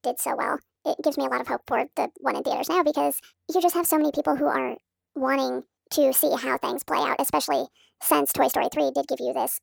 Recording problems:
wrong speed and pitch; too fast and too high; 1.5 times normal speed

